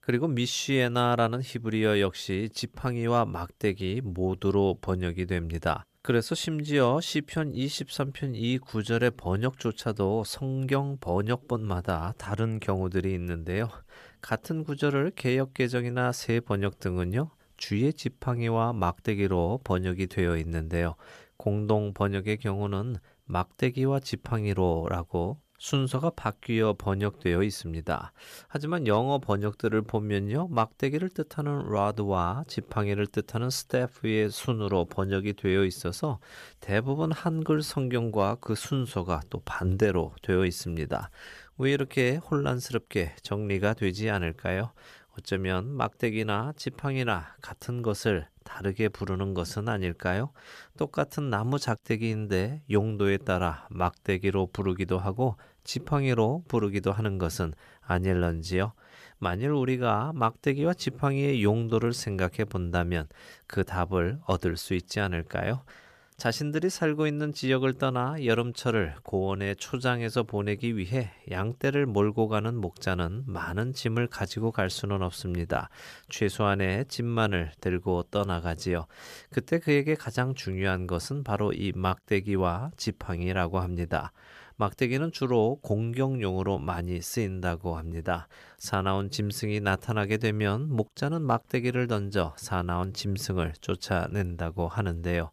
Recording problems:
none

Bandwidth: 14.5 kHz